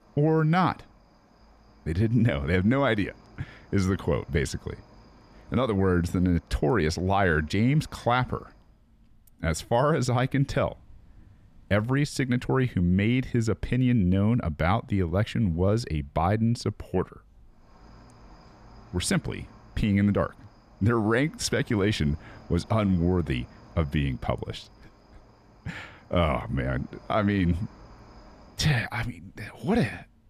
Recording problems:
animal sounds; faint; throughout; 30 dB below the speech

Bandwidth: 14.5 kHz